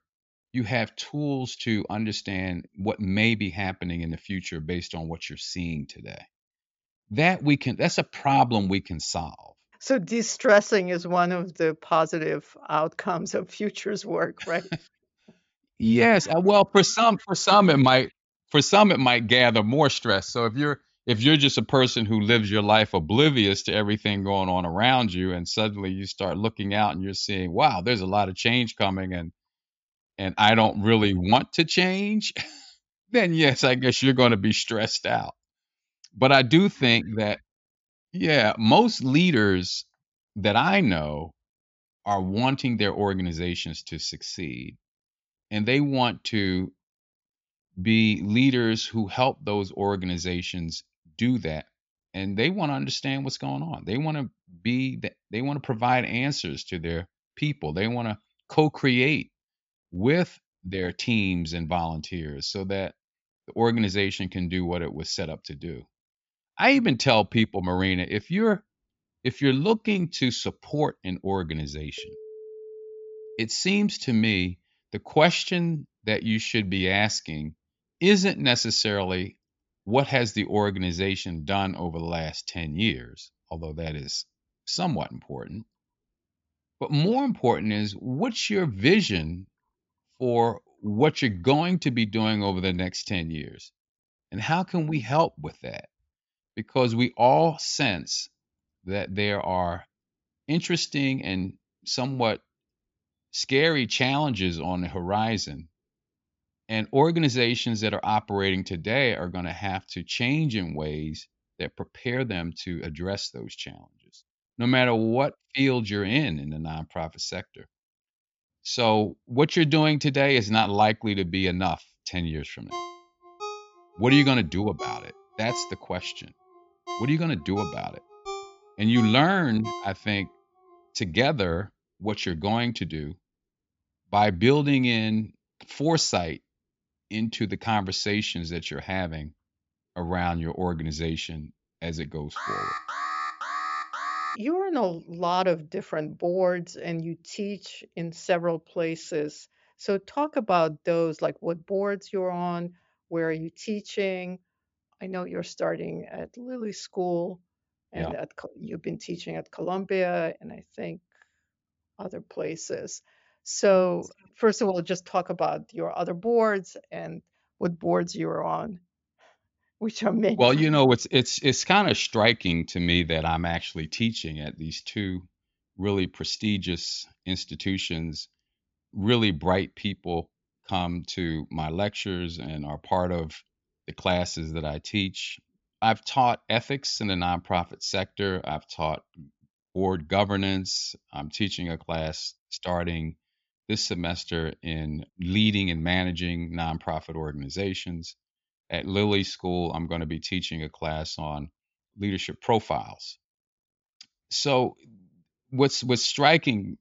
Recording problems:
high frequencies cut off; noticeable; nothing above 7.5 kHz
phone ringing; faint; from 1:12 to 1:13 and from 2:03 to 2:10; peak 10 dB below the speech
alarm; noticeable; from 2:22 to 2:24; peak 5 dB below the speech

